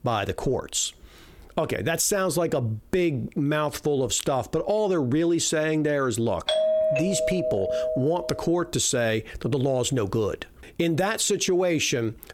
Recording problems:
squashed, flat; heavily
doorbell; loud; from 6.5 to 8.5 s; peak 3 dB above the speech

